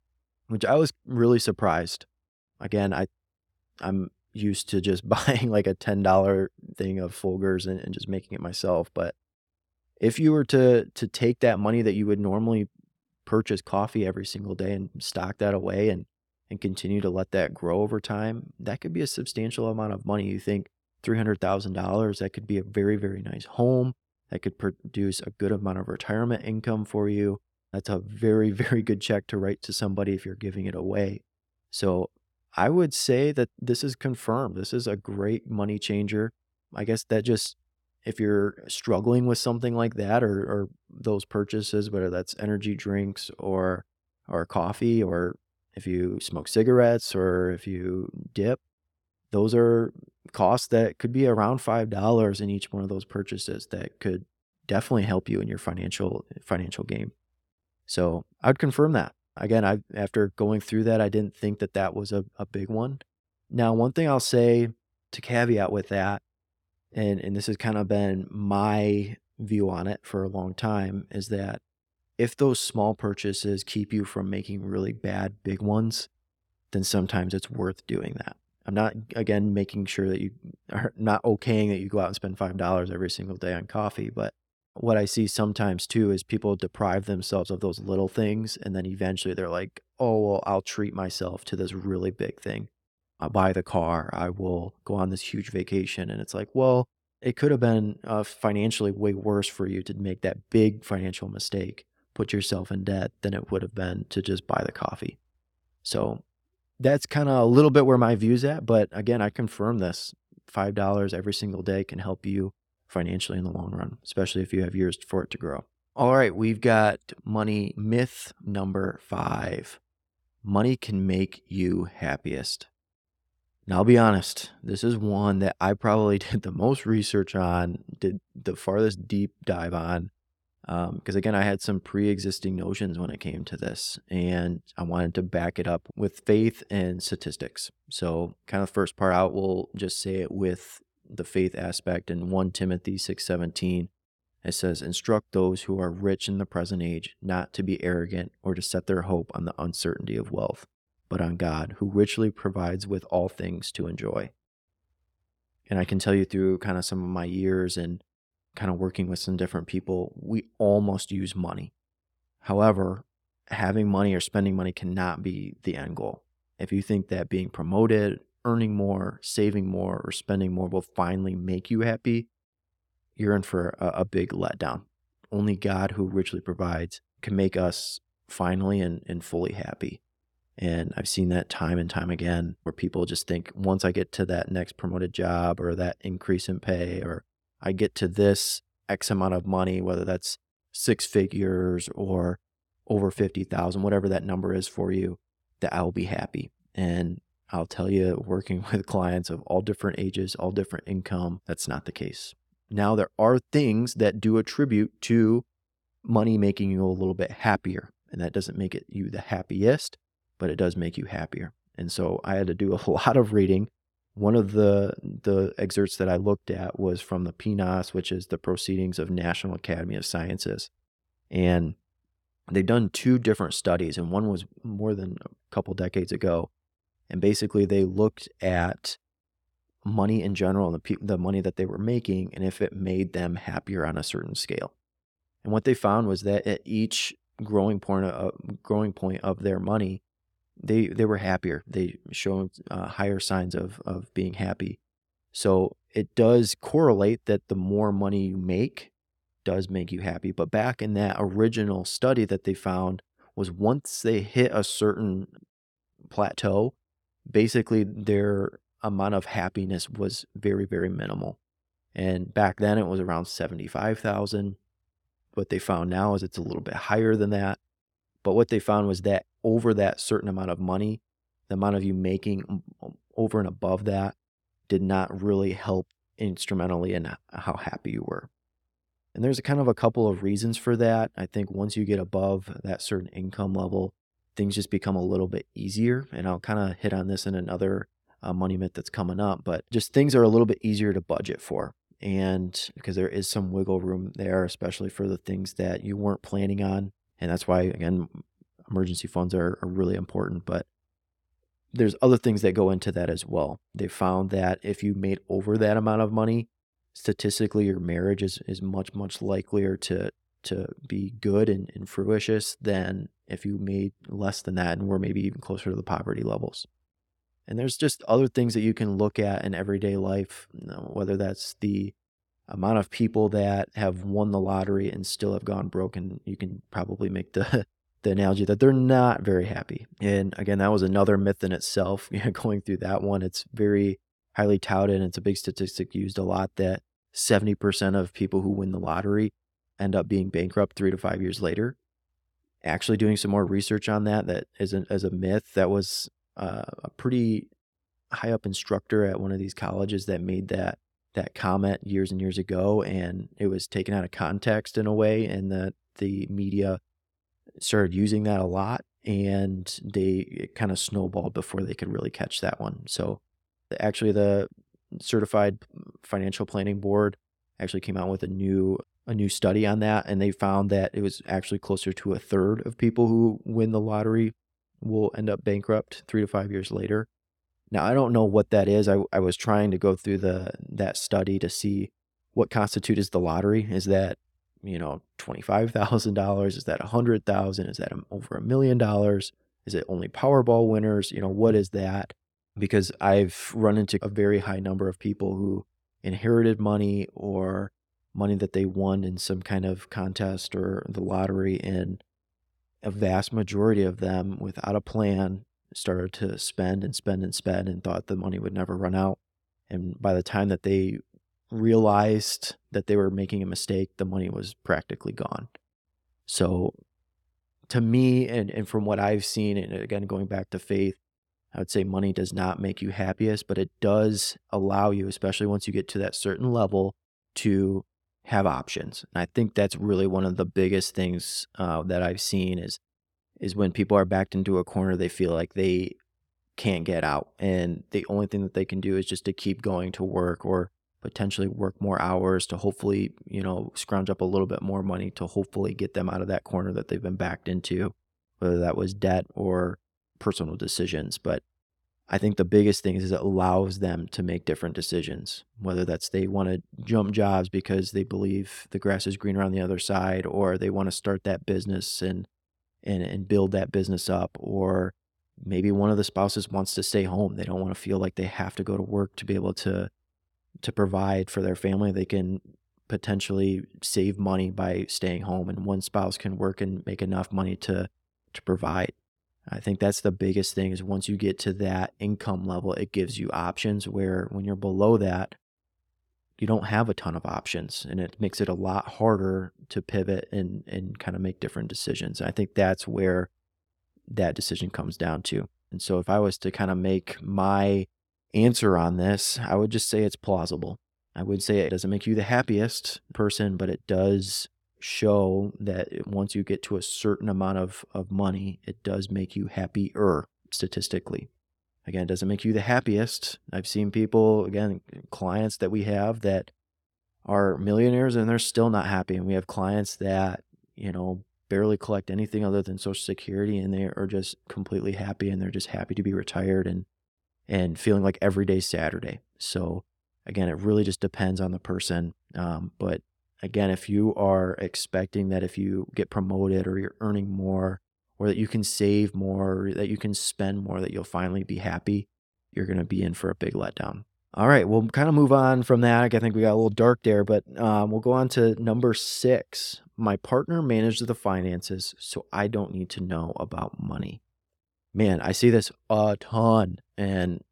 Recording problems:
none

